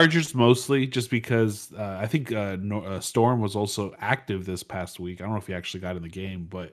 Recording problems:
abrupt cut into speech; at the start

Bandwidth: 14 kHz